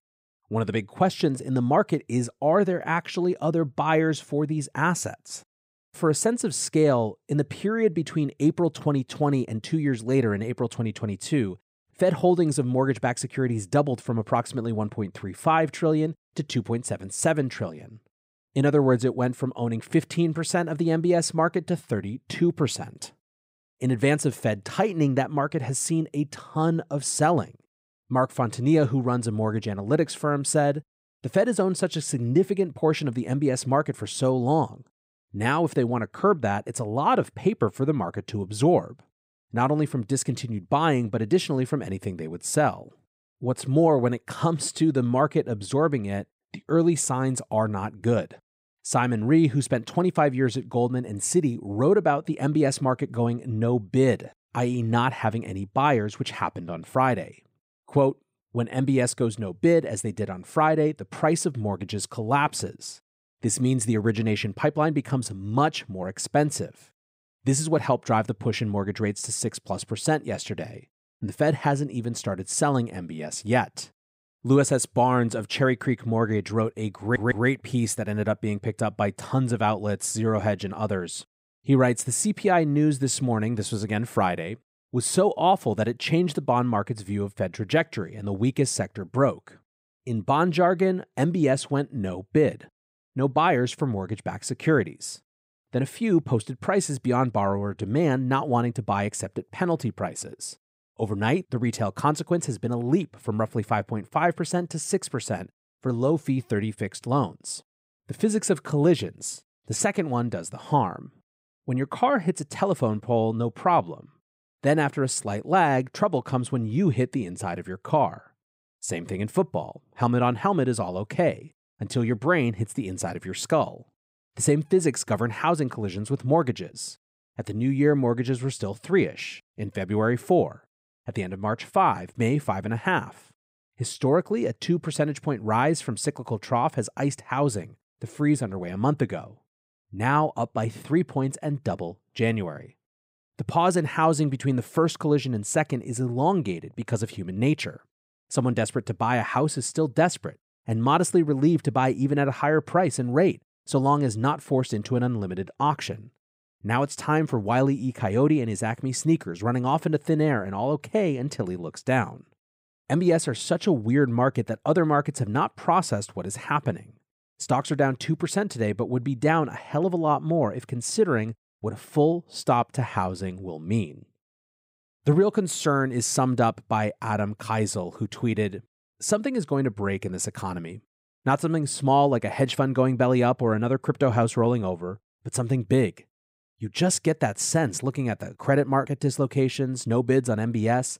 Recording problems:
audio stuttering; at 1:17

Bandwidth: 15.5 kHz